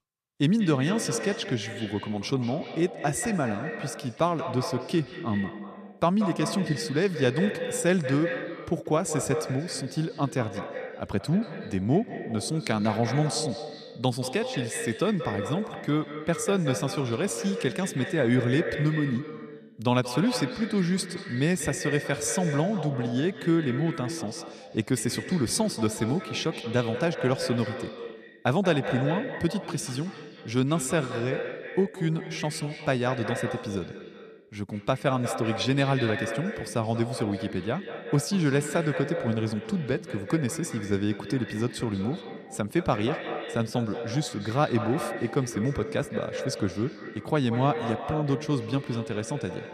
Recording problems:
echo of what is said; strong; throughout; 180 ms later, 8 dB below the speech

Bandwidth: 14.5 kHz